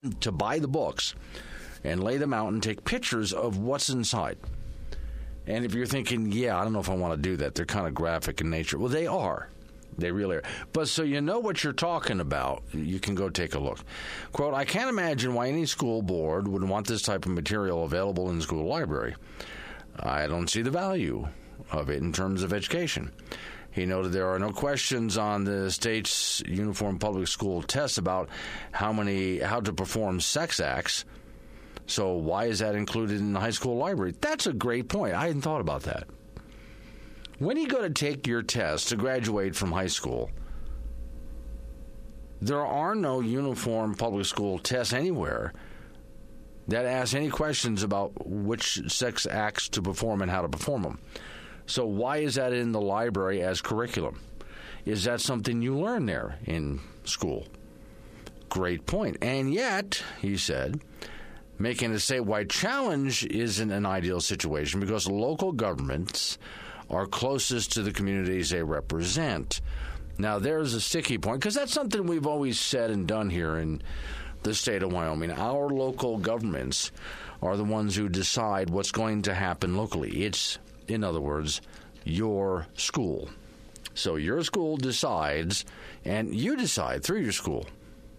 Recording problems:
squashed, flat; heavily

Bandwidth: 14.5 kHz